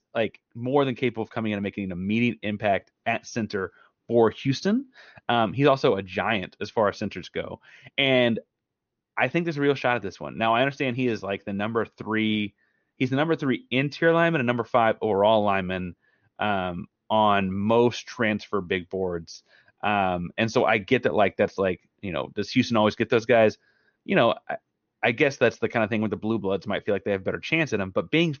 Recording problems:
high frequencies cut off; noticeable; nothing above 6.5 kHz

